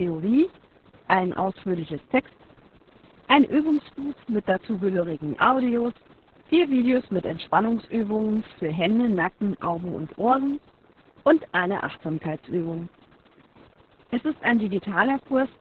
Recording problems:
garbled, watery; badly
hiss; faint; throughout; 30 dB below the speech
abrupt cut into speech; at the start

